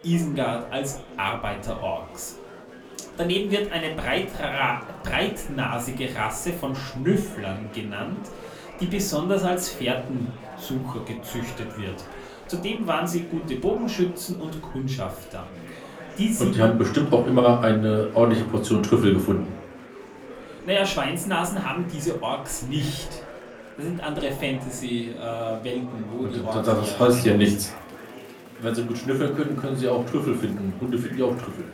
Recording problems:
off-mic speech; far
room echo; very slight; dies away in 0.3 s
murmuring crowd; noticeable; throughout; 15 dB below the speech

